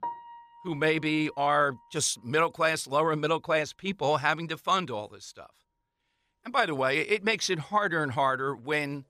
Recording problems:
background music; faint; throughout; 20 dB below the speech

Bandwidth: 15 kHz